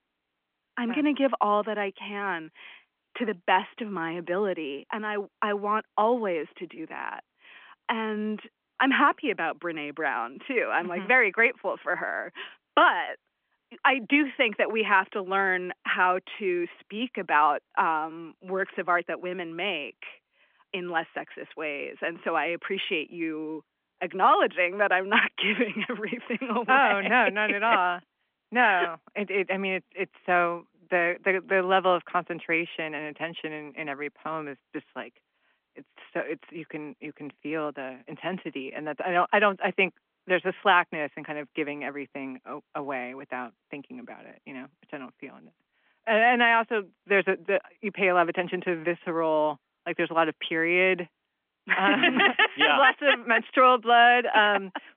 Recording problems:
phone-call audio; nothing above 3 kHz

